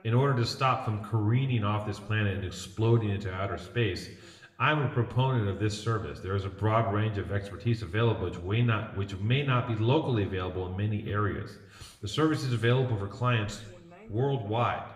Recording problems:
room echo; slight; dies away in 0.7 s
off-mic speech; somewhat distant
voice in the background; faint; throughout; 30 dB below the speech

